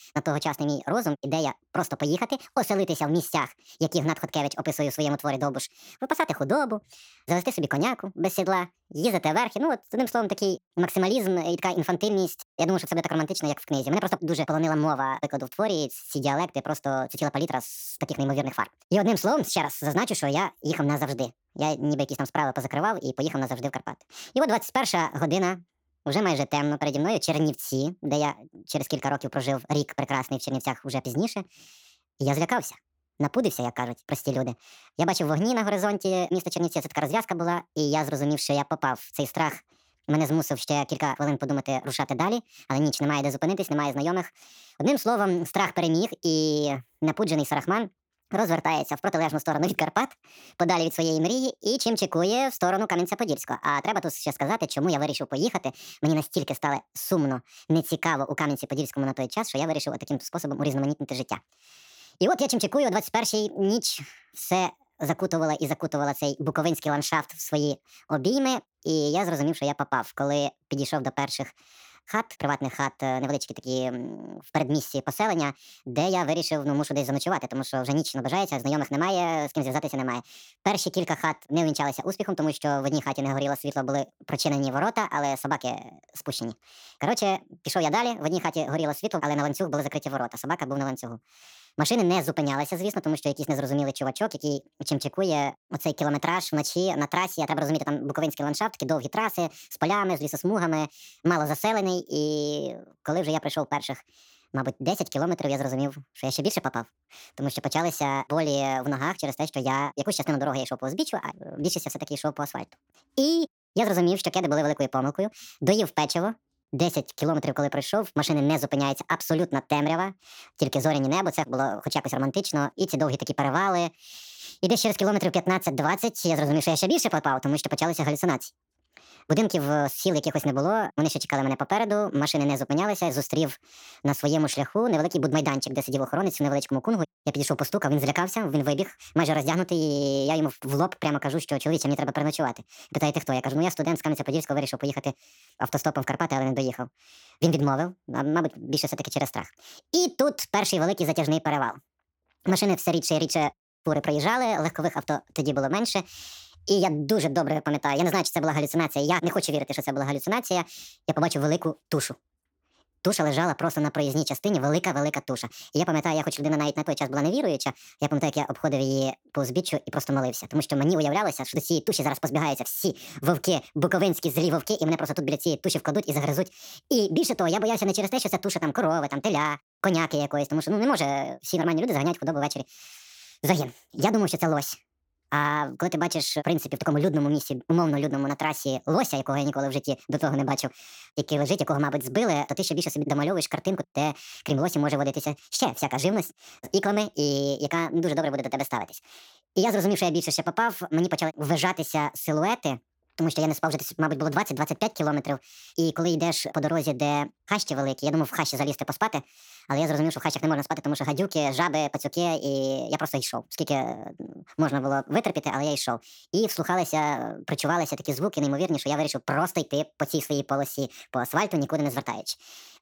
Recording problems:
wrong speed and pitch; too fast and too high; 1.6 times normal speed

